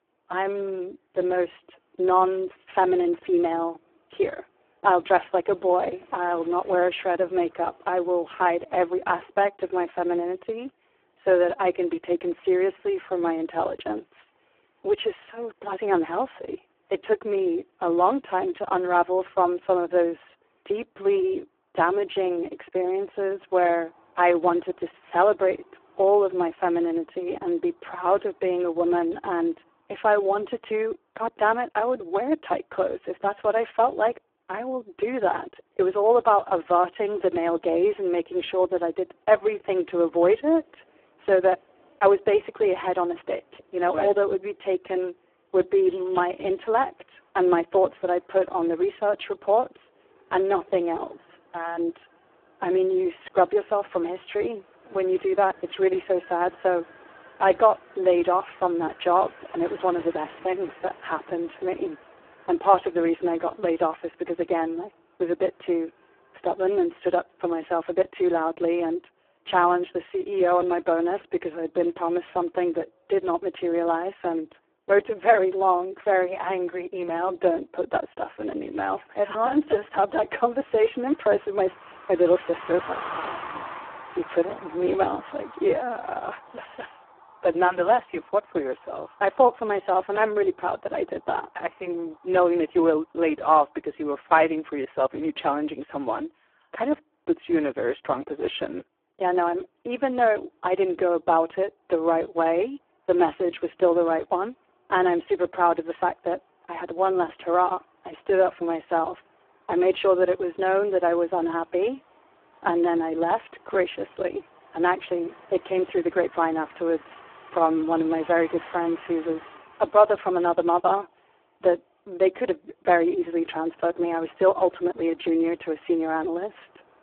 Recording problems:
phone-call audio; poor line
traffic noise; faint; throughout; 20 dB below the speech

